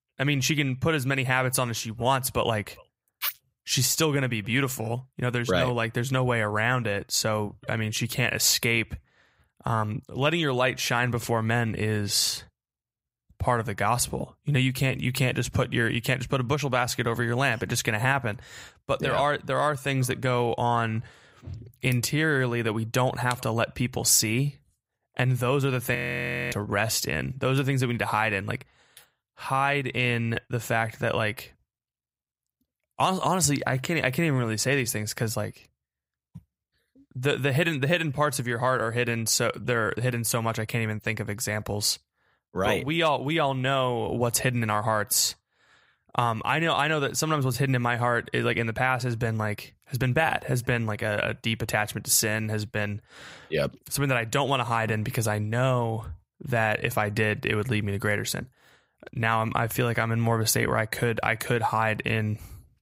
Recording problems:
audio freezing; at 26 s for 0.5 s

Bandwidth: 15.5 kHz